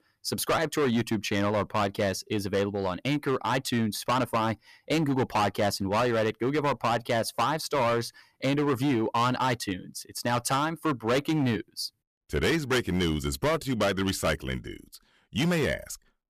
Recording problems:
distortion; heavy; 12% of the sound clipped

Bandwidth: 14.5 kHz